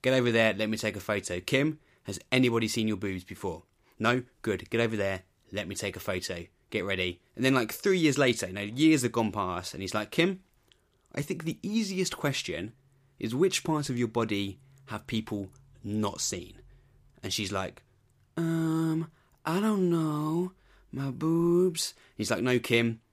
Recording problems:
none

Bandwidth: 15 kHz